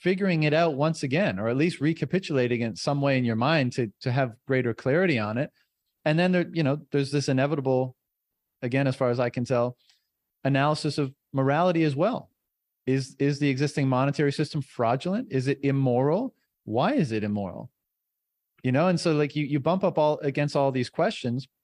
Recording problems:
none

